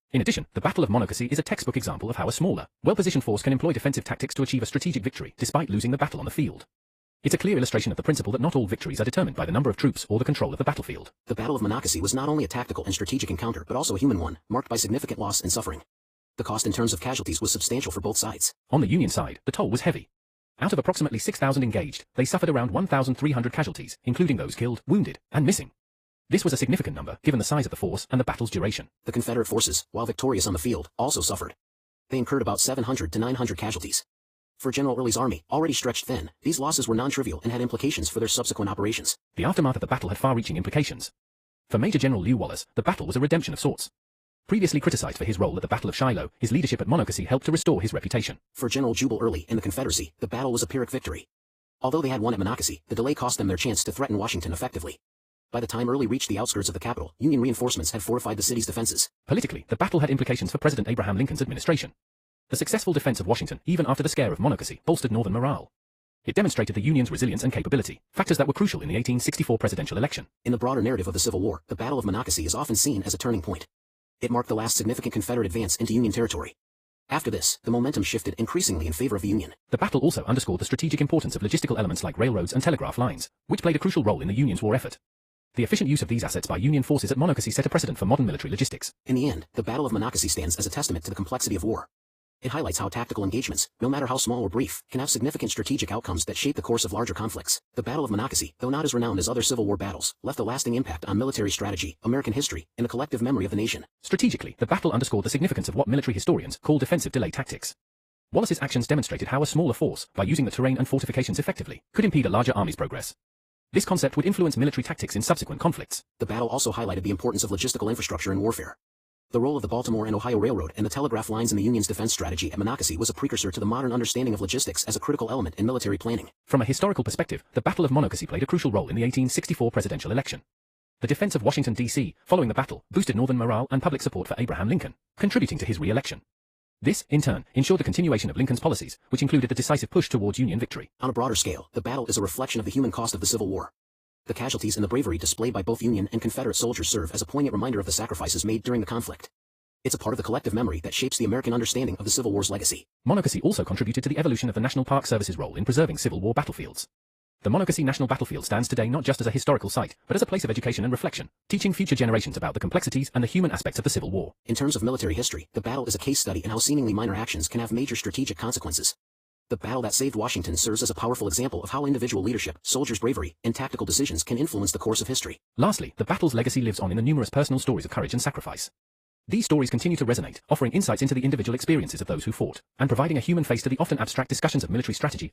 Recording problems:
wrong speed, natural pitch; too fast; 1.6 times normal speed
garbled, watery; slightly; nothing above 15 kHz

